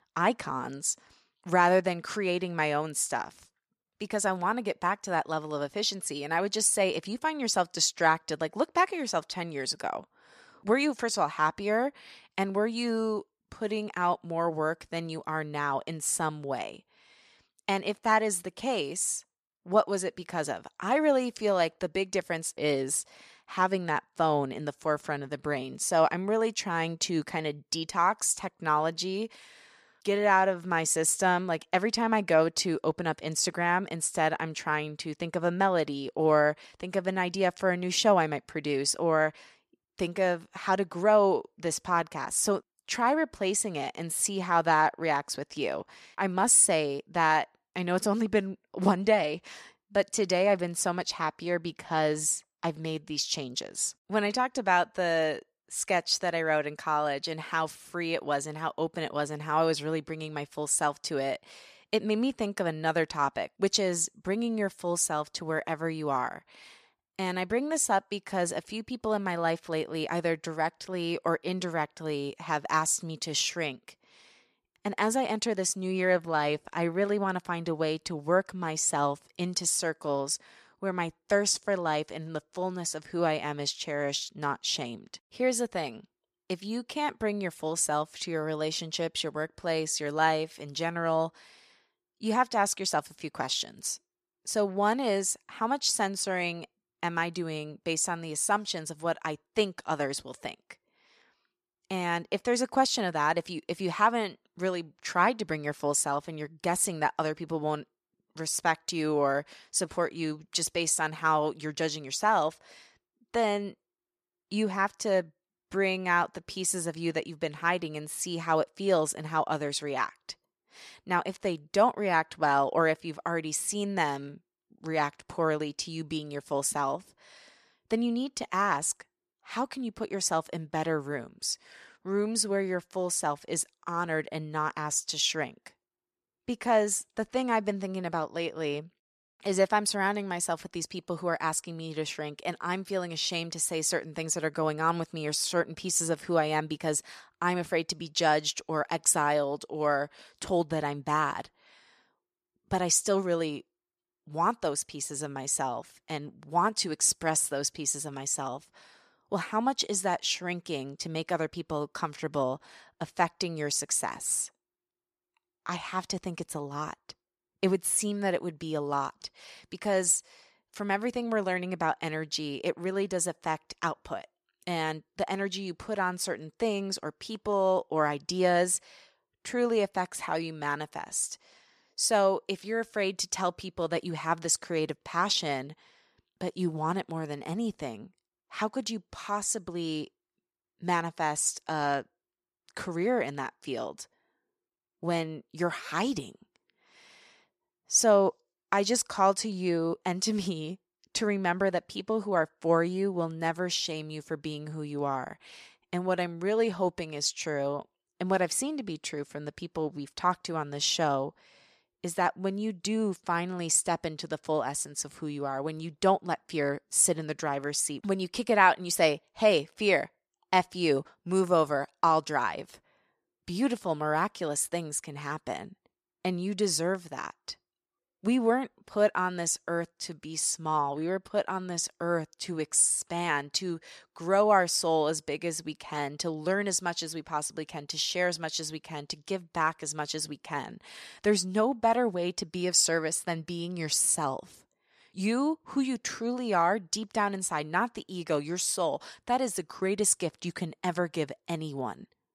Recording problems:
none

